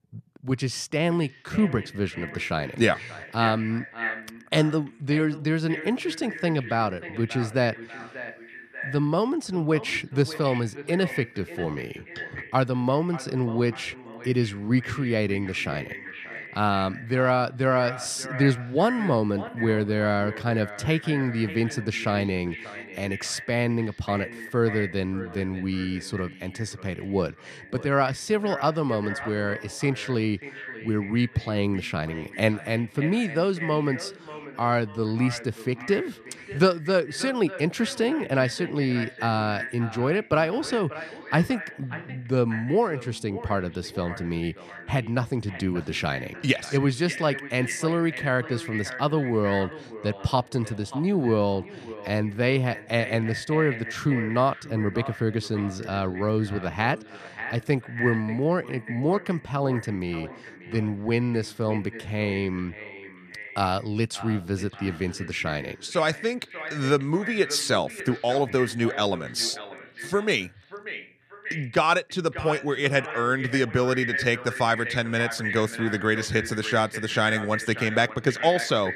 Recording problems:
echo of what is said; strong; throughout; 590 ms later, 10 dB below the speech

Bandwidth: 14.5 kHz